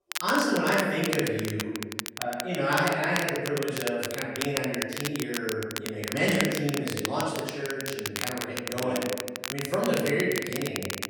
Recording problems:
room echo; strong; dies away in 1.3 s
off-mic speech; far
crackle, like an old record; loud; 6 dB below the speech

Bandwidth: 17 kHz